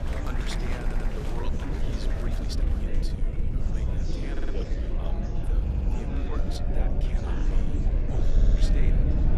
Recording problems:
murmuring crowd; very loud; throughout; 3 dB above the speech
low rumble; loud; throughout; 1 dB below the speech
audio stuttering; 4 times, first at 1 s
uneven, jittery; strongly; from 1.5 to 8.5 s

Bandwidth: 15 kHz